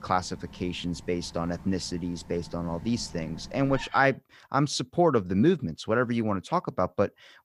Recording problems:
animal sounds; noticeable; until 4 s; 20 dB below the speech

